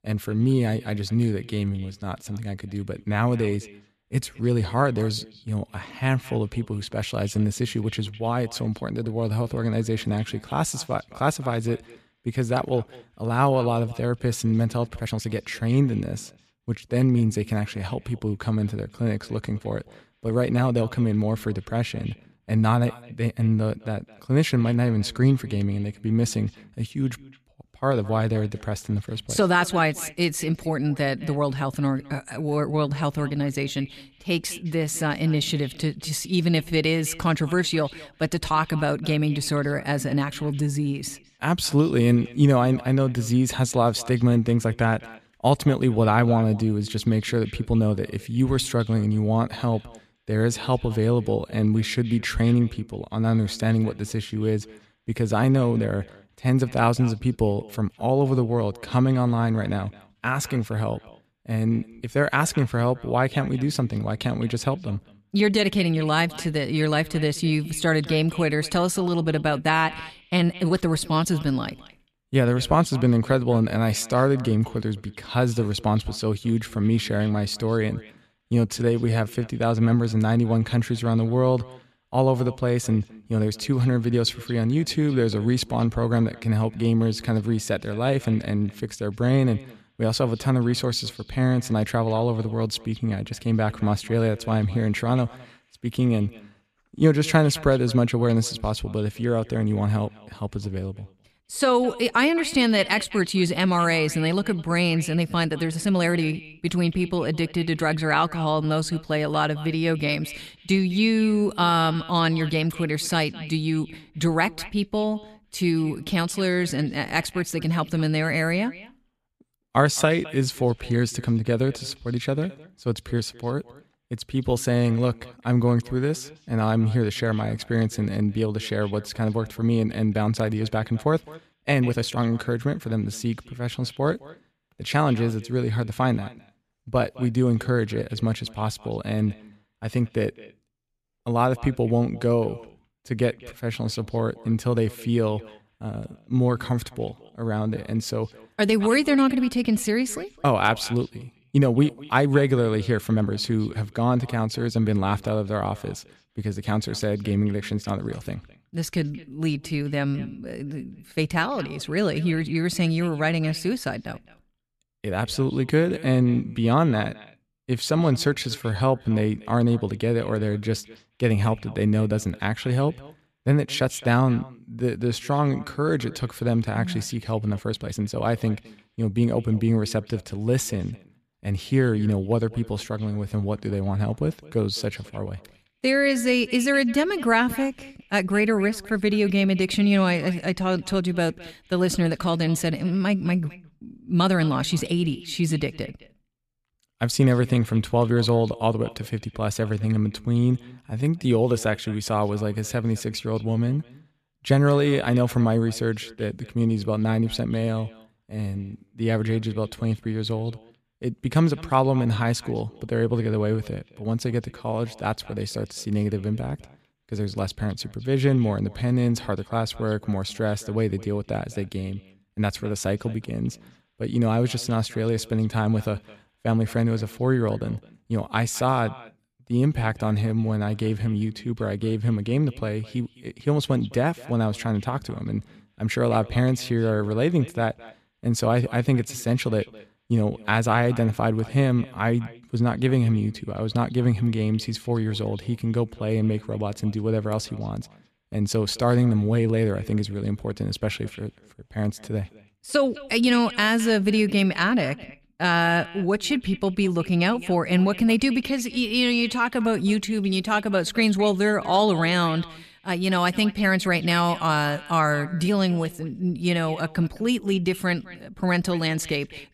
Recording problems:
echo of what is said; faint; throughout; 210 ms later, 20 dB below the speech
uneven, jittery; strongly; from 1.5 s to 3:21

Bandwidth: 14.5 kHz